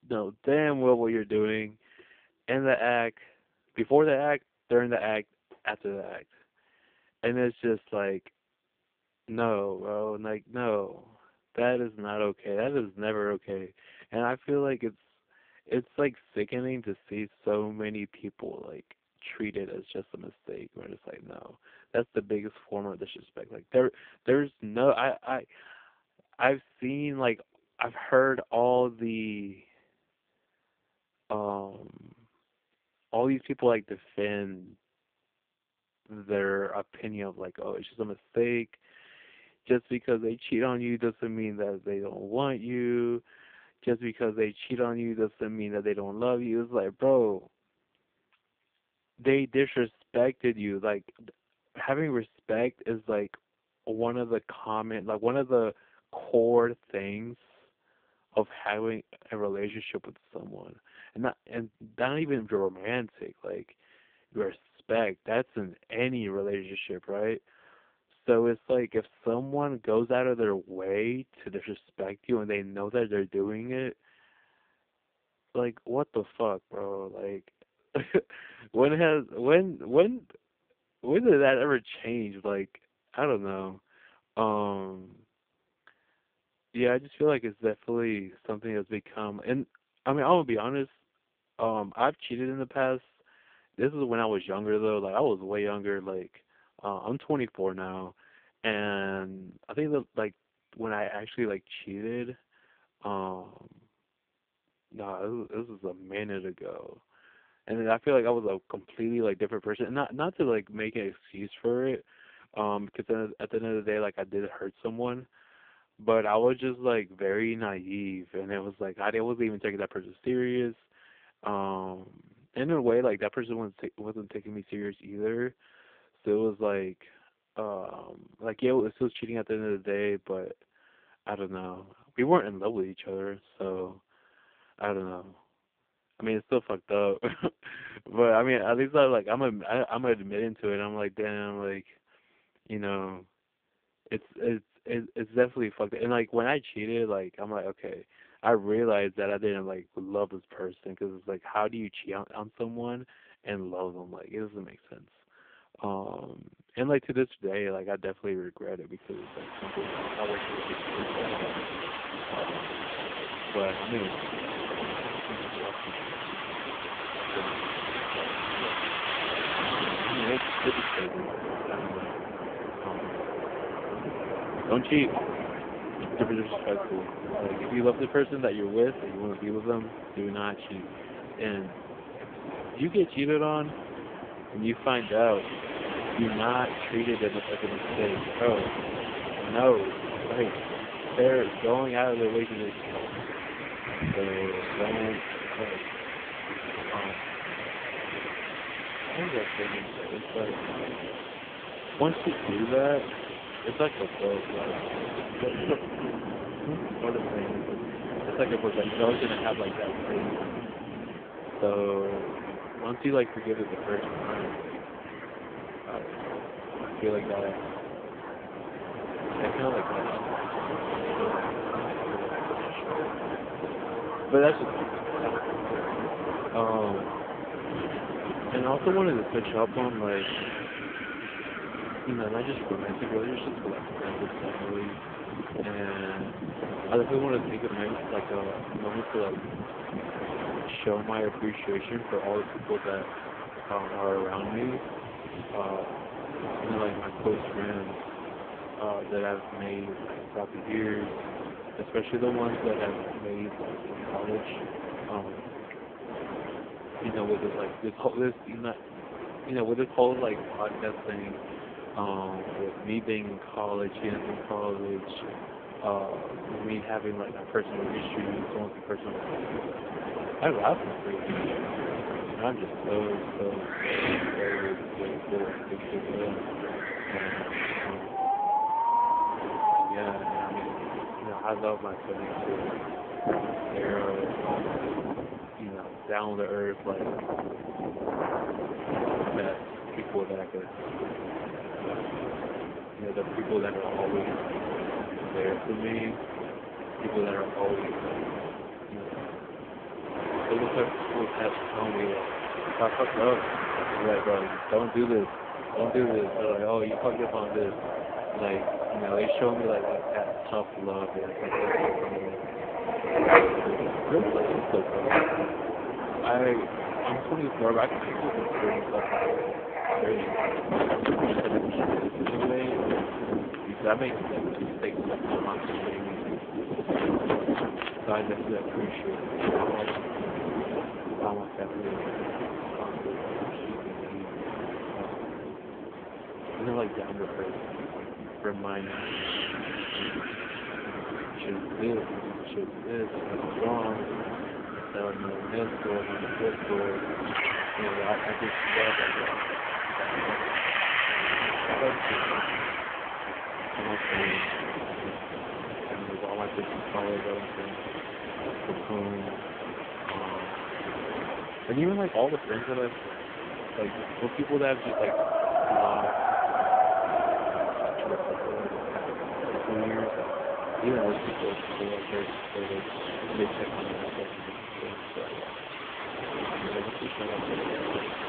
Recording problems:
phone-call audio; poor line
wind in the background; loud; from 2:40 on; 2 dB below the speech

